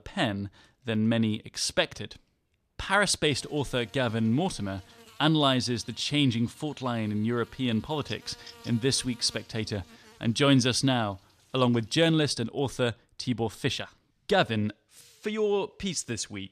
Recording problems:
electrical hum; faint; from 3.5 to 12 s; 60 Hz, 25 dB below the speech

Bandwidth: 14 kHz